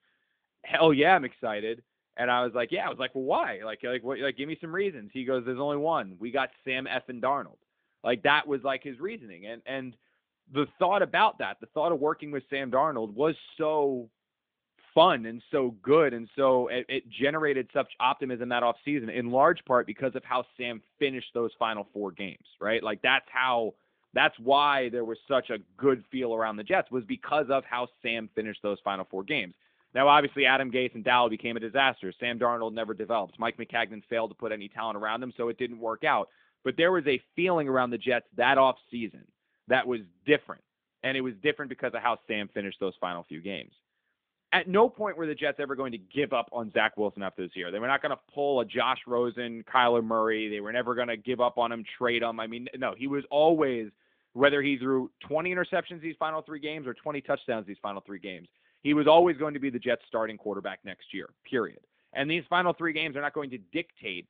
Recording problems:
phone-call audio; nothing above 3.5 kHz

